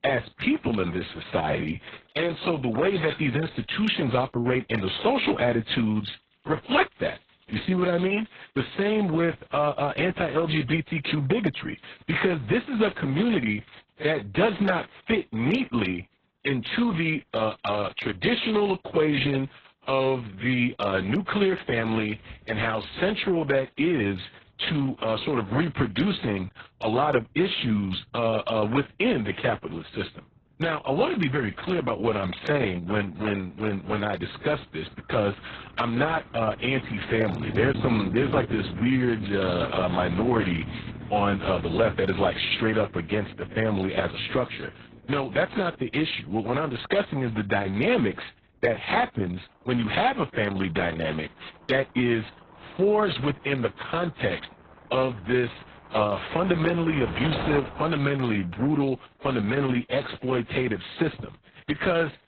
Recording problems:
garbled, watery; badly; nothing above 7 kHz
traffic noise; noticeable; throughout; 15 dB below the speech

